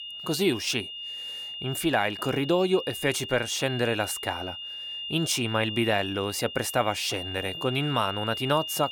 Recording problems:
high-pitched whine; loud; throughout; 3 kHz, 7 dB below the speech

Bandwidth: 18 kHz